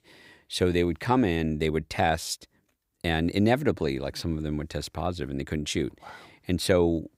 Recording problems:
none

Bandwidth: 15.5 kHz